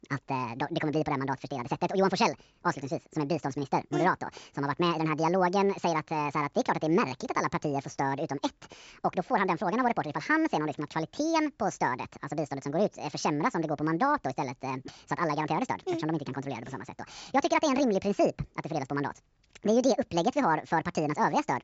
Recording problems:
wrong speed and pitch; too fast and too high; 1.6 times normal speed
high frequencies cut off; noticeable; nothing above 8 kHz

